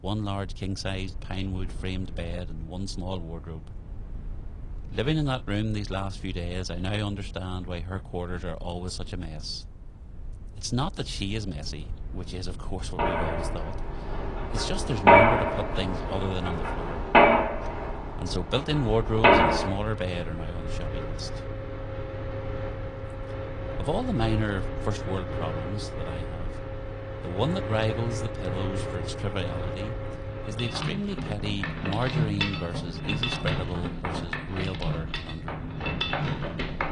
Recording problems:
garbled, watery; slightly
machinery noise; very loud; from 13 s on; 4 dB above the speech
low rumble; faint; throughout; 20 dB below the speech

